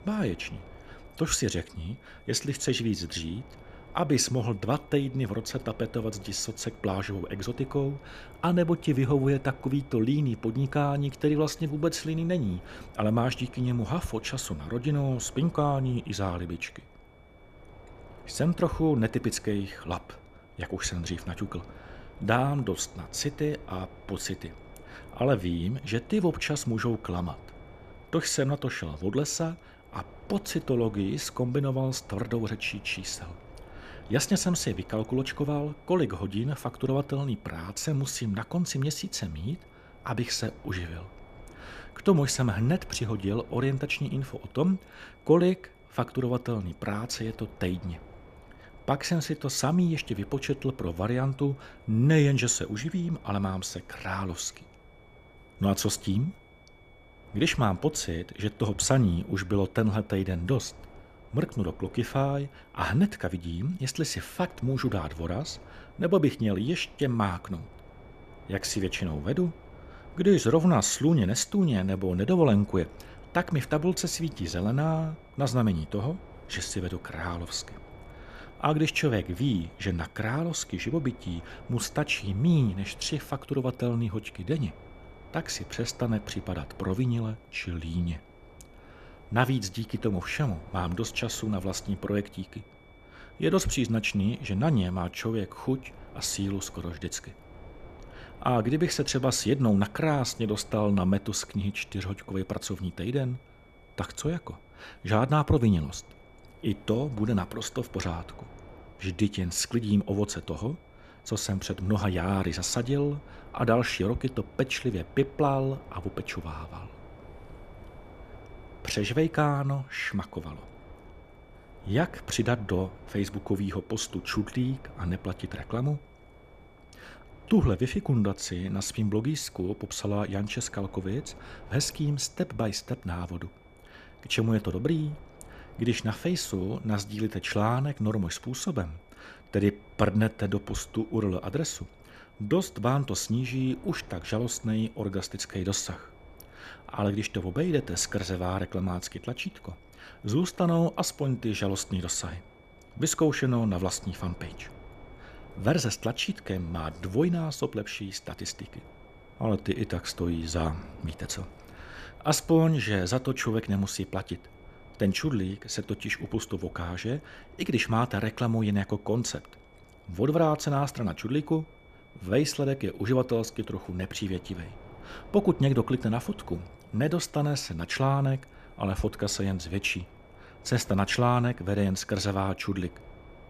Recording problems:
wind noise on the microphone; occasional gusts; 20 dB below the speech
high-pitched whine; faint; throughout; 2.5 kHz, 30 dB below the speech

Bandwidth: 14.5 kHz